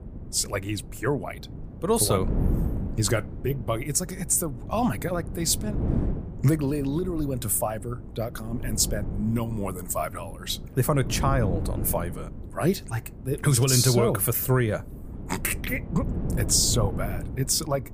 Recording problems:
wind noise on the microphone; occasional gusts; 15 dB below the speech

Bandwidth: 15 kHz